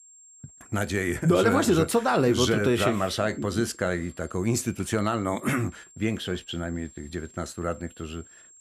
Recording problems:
high-pitched whine; faint; throughout; 7.5 kHz, 25 dB below the speech

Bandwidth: 15 kHz